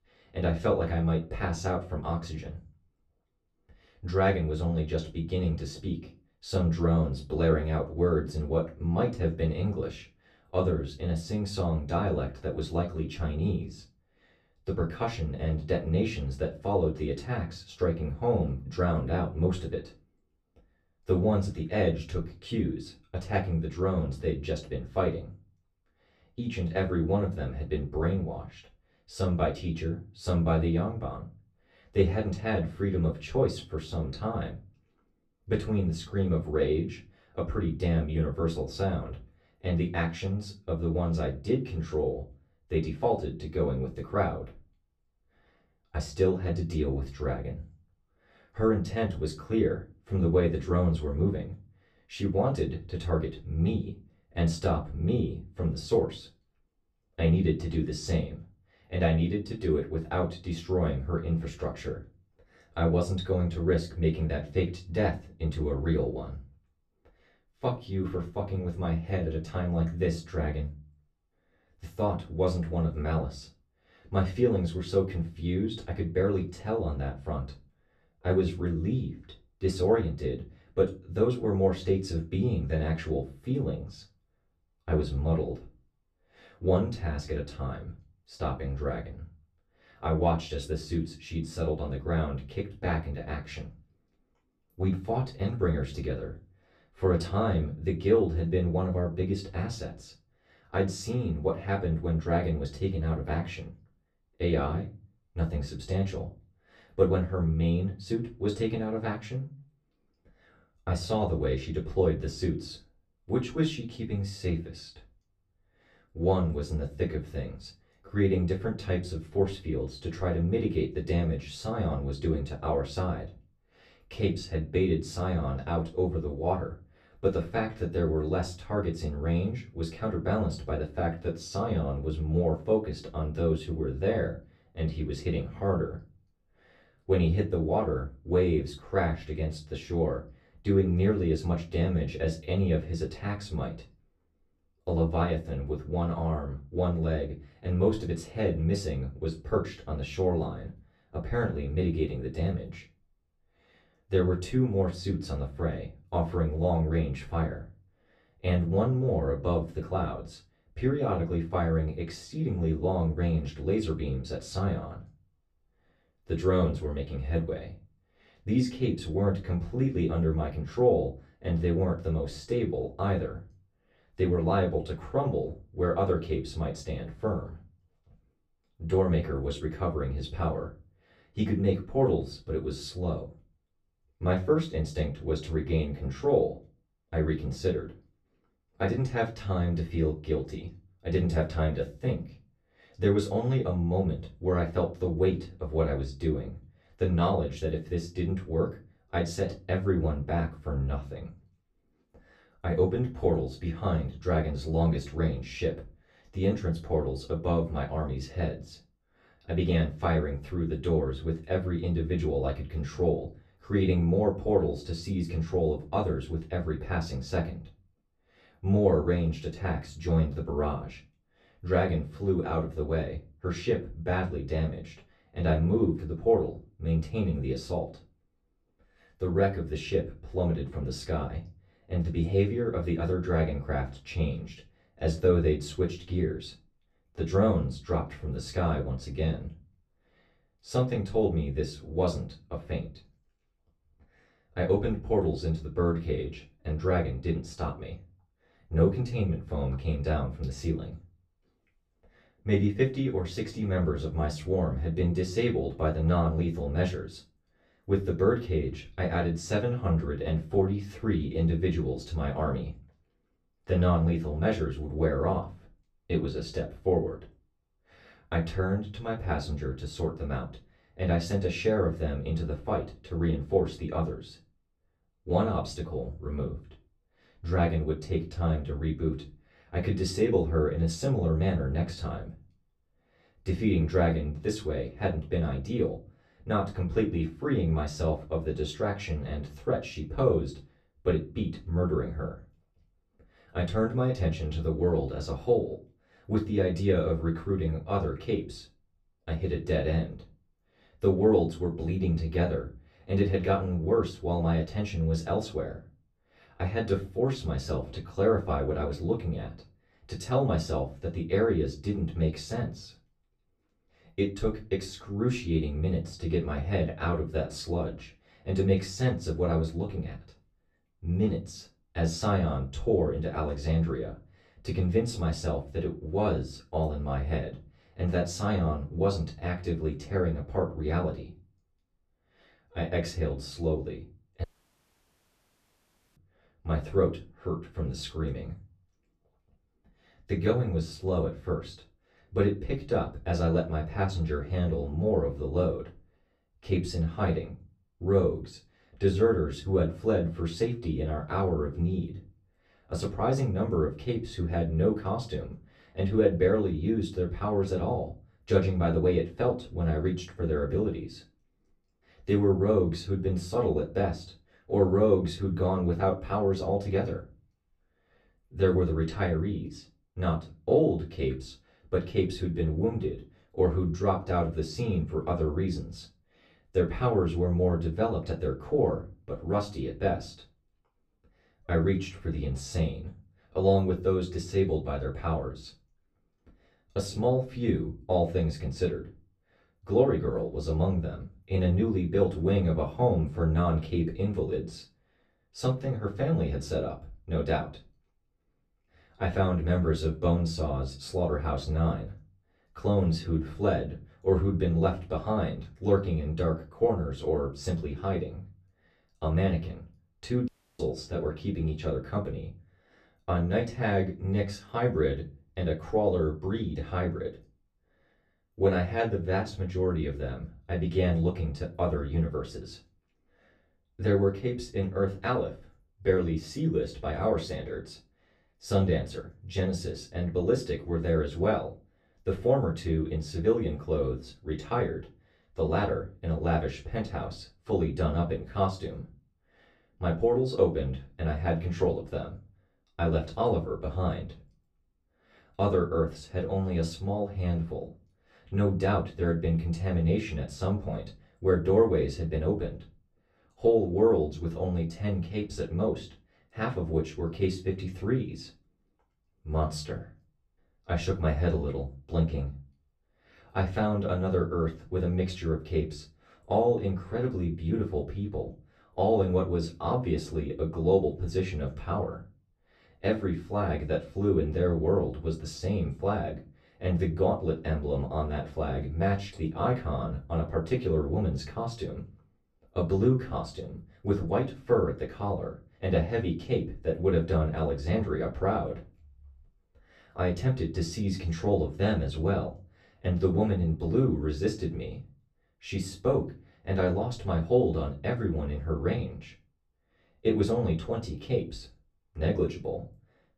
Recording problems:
off-mic speech; far
room echo; very slight; dies away in 0.3 s
audio cutting out; at 5:34 for 1.5 s and at 6:50

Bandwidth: 14.5 kHz